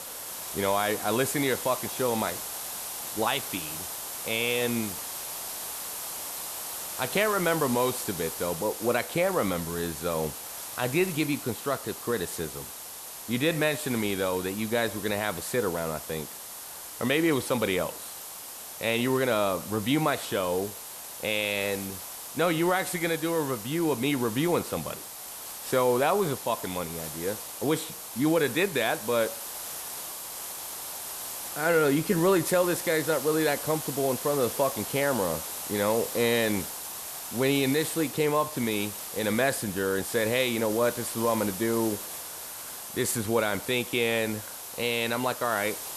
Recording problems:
hiss; loud; throughout; 8 dB below the speech

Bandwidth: 13.5 kHz